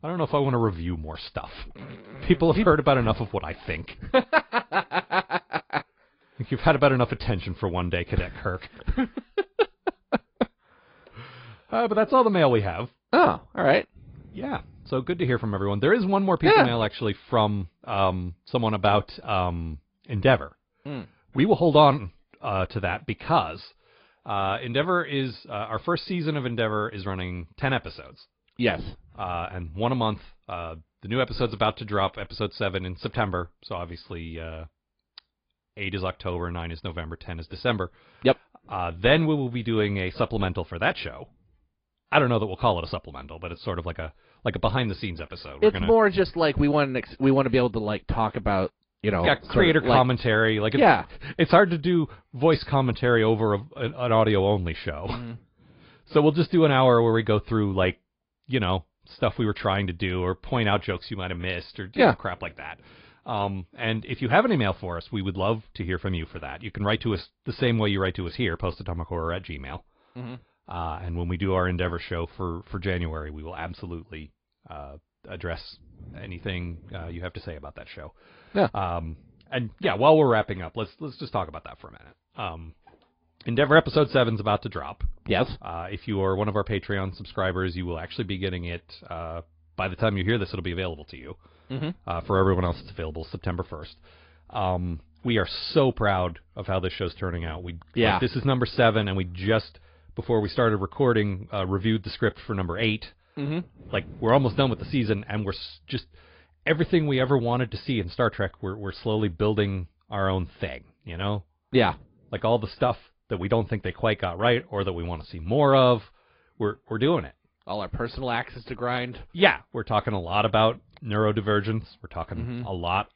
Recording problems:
high frequencies cut off; noticeable; nothing above 5 kHz
garbled, watery; slightly

